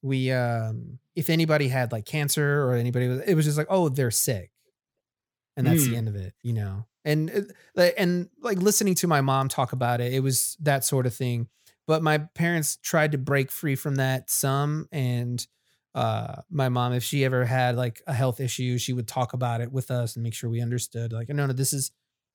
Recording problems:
none

